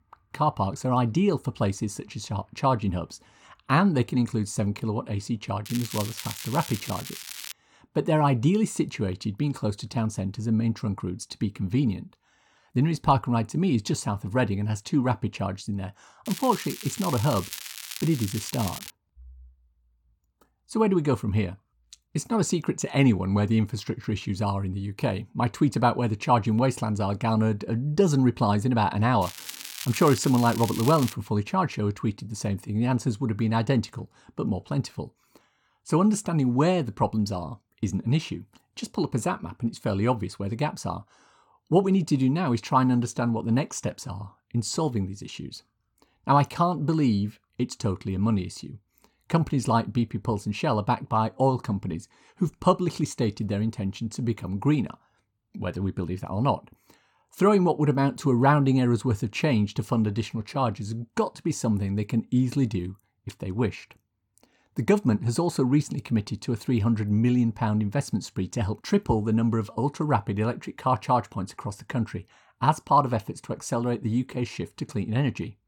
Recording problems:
crackling; noticeable; from 5.5 to 7.5 s, from 16 to 19 s and from 29 to 31 s; 10 dB below the speech

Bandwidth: 17 kHz